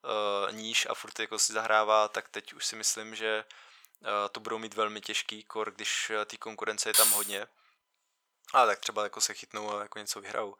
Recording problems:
thin; very; fading below 800 Hz
jangling keys; loud; at 7 s; peak 9 dB above the speech

